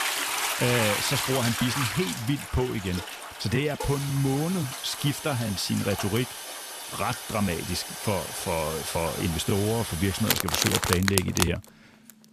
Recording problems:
household noises; loud; throughout; 2 dB below the speech

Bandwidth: 14.5 kHz